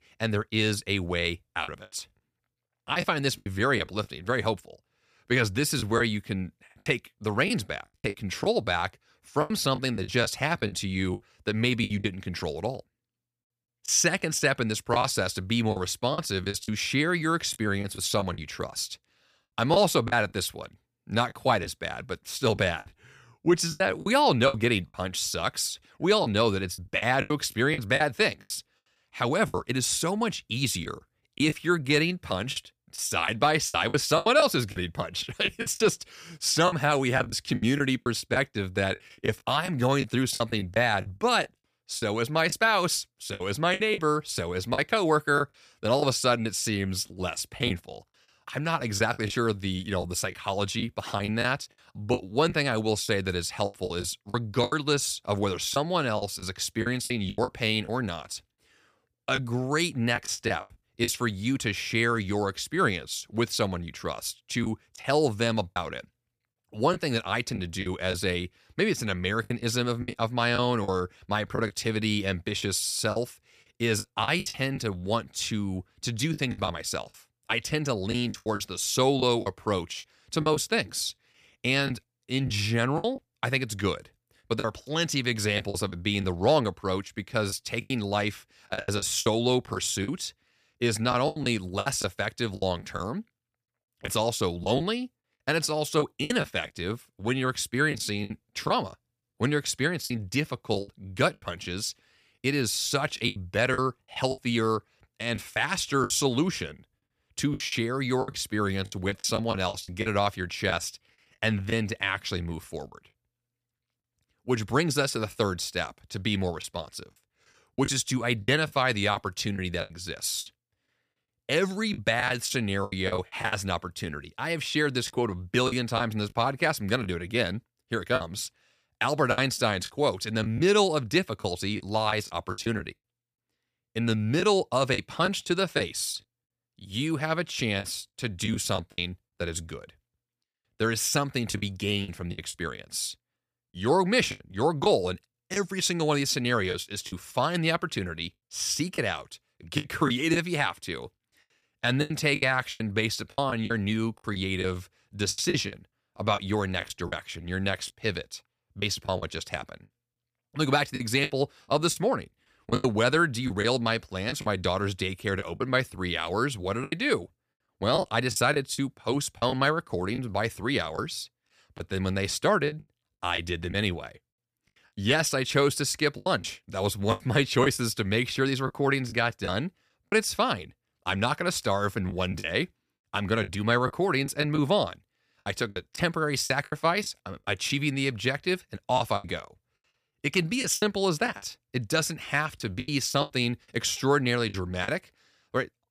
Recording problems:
choppy; very; 8% of the speech affected

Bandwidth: 15 kHz